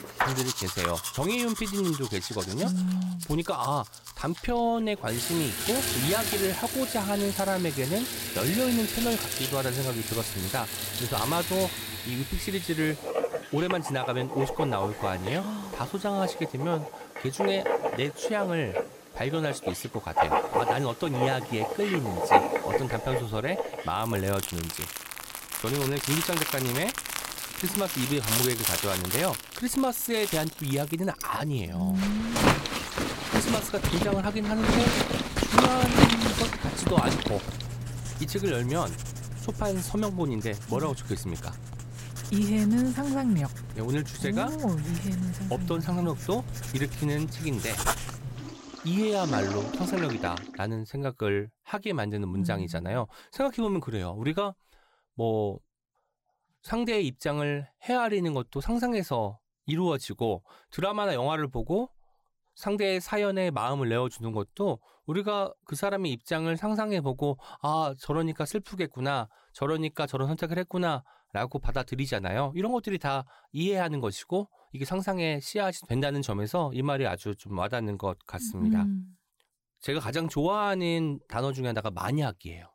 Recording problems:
household noises; loud; until 50 s; 1 dB below the speech

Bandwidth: 16 kHz